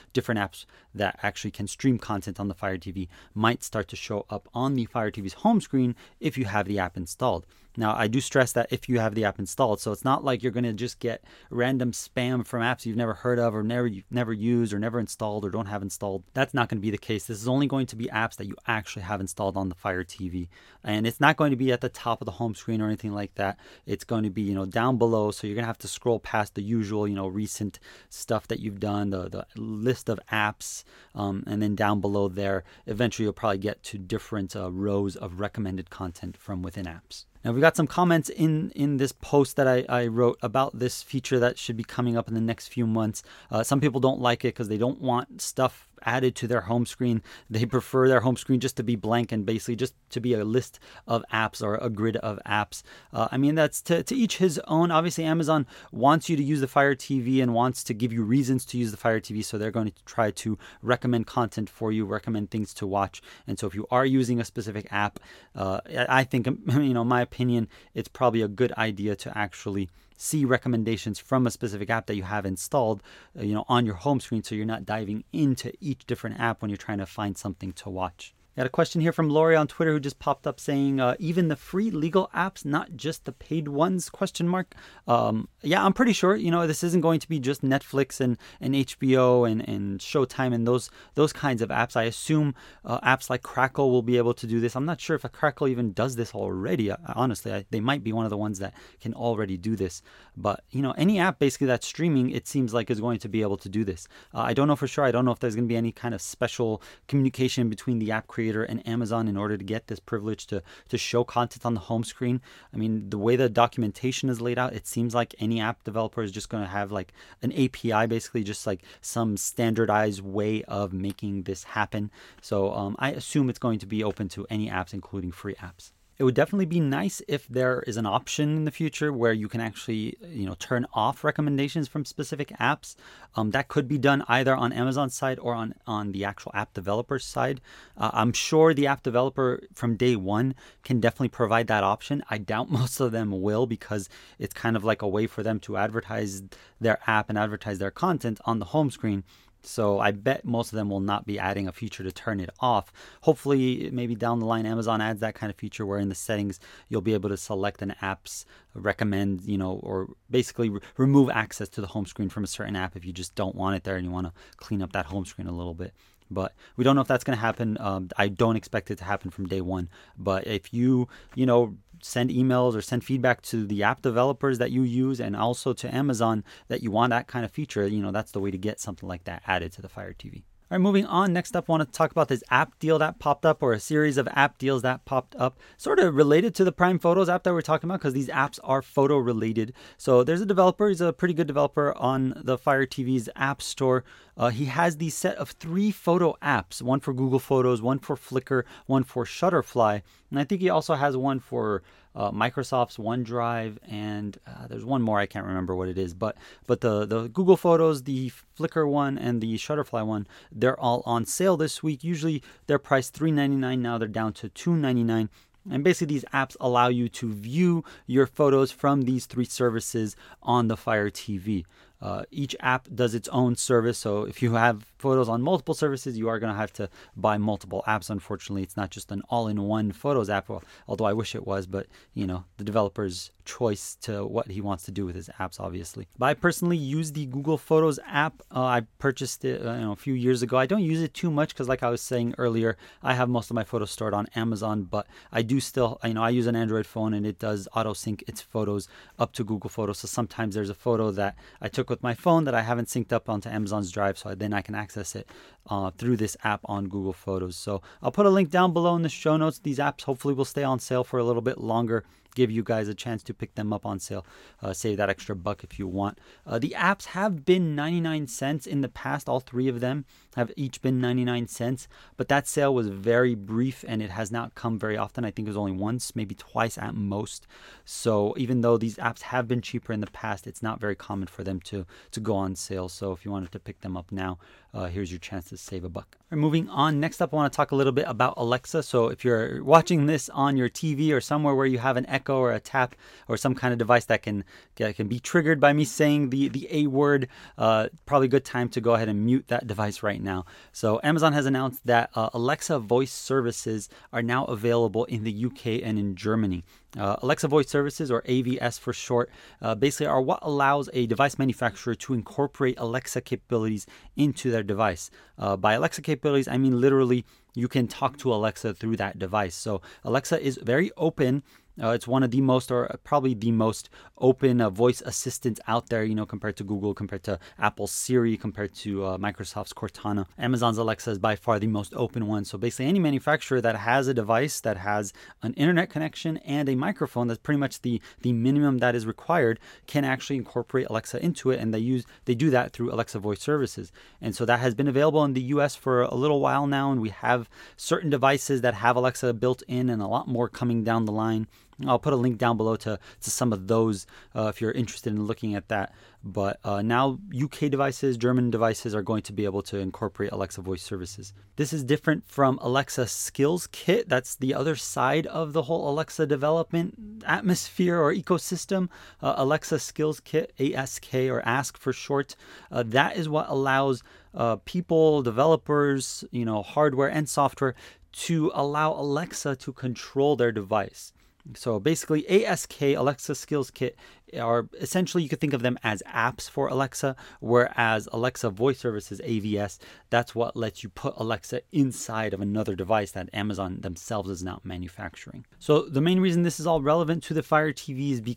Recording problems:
none

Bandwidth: 16.5 kHz